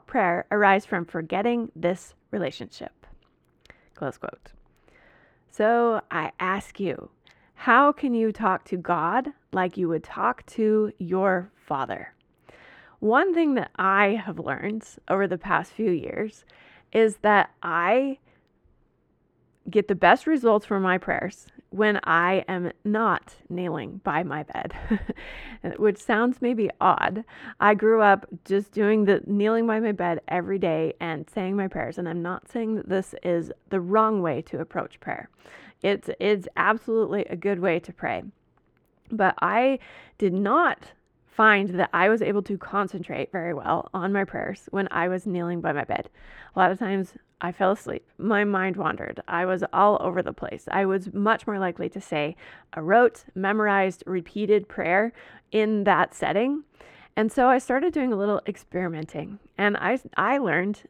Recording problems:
muffled; very; fading above 3.5 kHz

